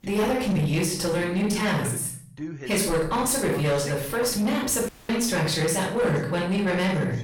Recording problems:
off-mic speech; far
room echo; noticeable; dies away in 0.5 s
distortion; slight; 10 dB below the speech
voice in the background; noticeable; throughout; 15 dB below the speech
audio cutting out; at 5 s

